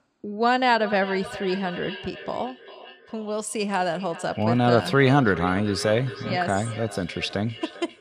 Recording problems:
echo of what is said; noticeable; throughout; 400 ms later, 15 dB below the speech

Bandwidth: 14 kHz